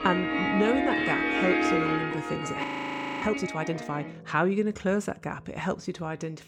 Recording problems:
background music; very loud; throughout; 2 dB above the speech
audio freezing; at 2.5 s for 0.5 s

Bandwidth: 17.5 kHz